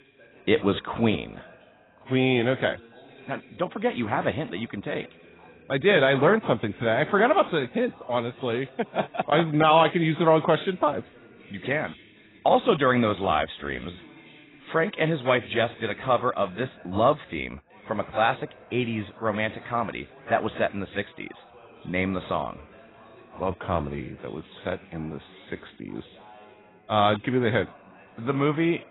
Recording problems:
garbled, watery; badly; nothing above 4 kHz
background chatter; faint; throughout; 2 voices, 25 dB below the speech

